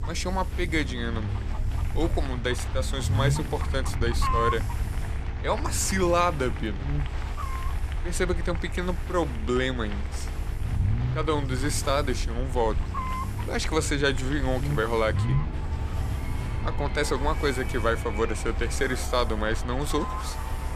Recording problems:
animal sounds; loud; throughout; 9 dB below the speech
crowd noise; noticeable; throughout; 15 dB below the speech
low rumble; noticeable; throughout; 20 dB below the speech
electrical hum; faint; throughout; 50 Hz, 20 dB below the speech
hiss; faint; throughout; 25 dB below the speech

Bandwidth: 14.5 kHz